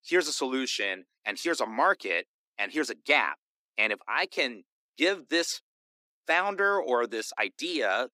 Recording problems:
thin; somewhat; fading below 300 Hz

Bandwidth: 15.5 kHz